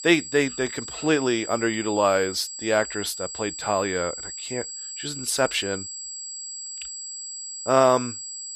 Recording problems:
high-pitched whine; loud; throughout; 7.5 kHz, 9 dB below the speech

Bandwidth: 15 kHz